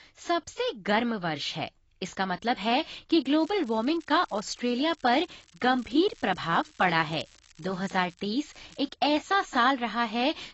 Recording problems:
garbled, watery; badly; nothing above 7.5 kHz
crackling; faint; from 3.5 to 8.5 s and at 8.5 s; 25 dB below the speech

